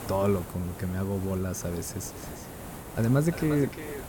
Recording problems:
echo of what is said; noticeable; from 2 s on; 350 ms later, 15 dB below the speech
hiss; noticeable; throughout; 10 dB below the speech

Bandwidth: 17 kHz